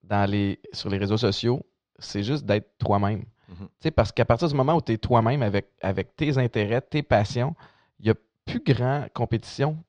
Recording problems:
muffled; very slightly; fading above 4.5 kHz

